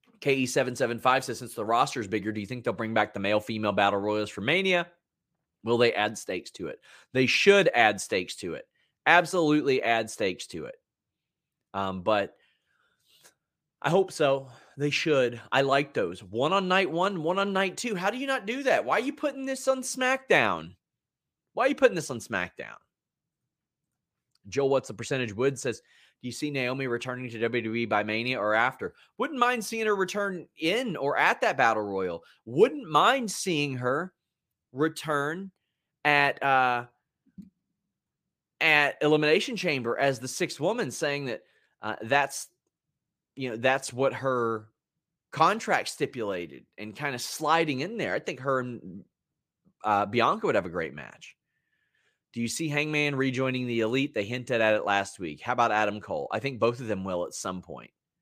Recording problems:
none

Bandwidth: 15 kHz